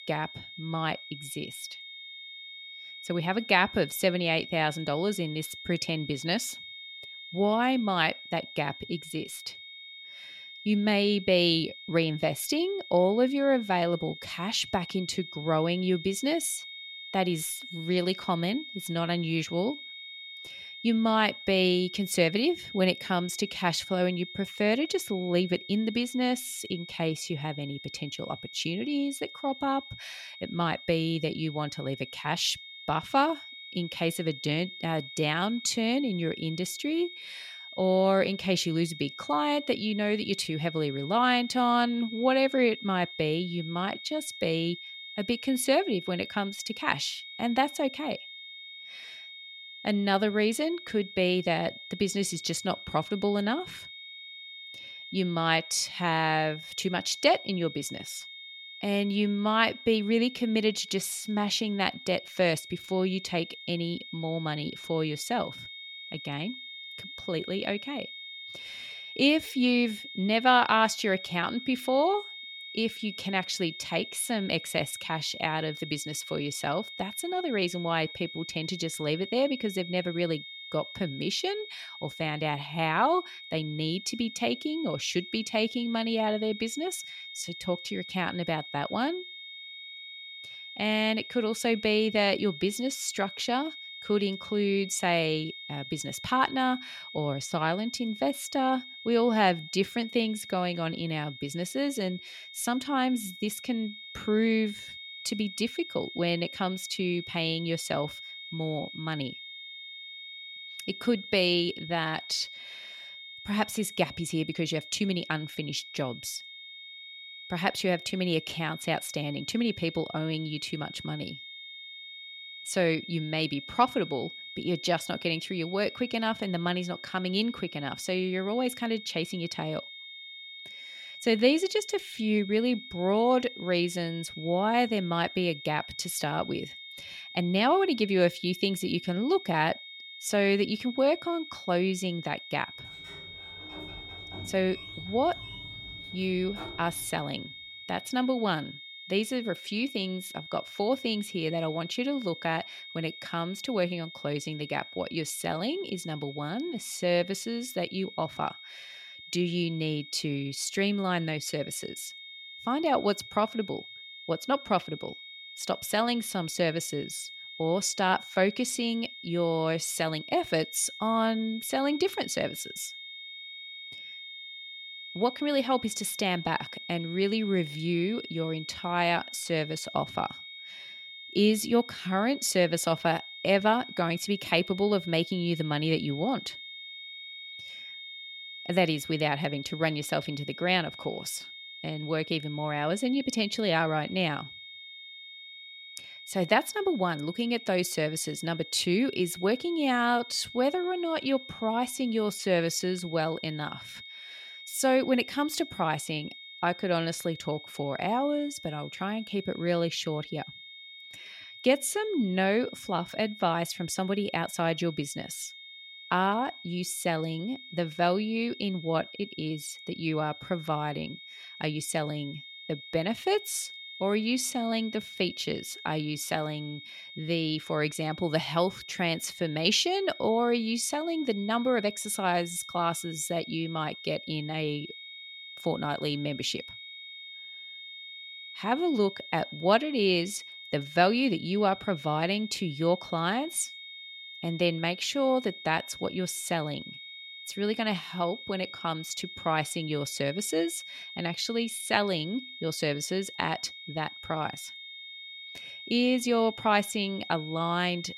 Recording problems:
high-pitched whine; noticeable; throughout; 3.5 kHz, 10 dB below the speech
door banging; faint; from 2:23 to 2:27; peak 15 dB below the speech

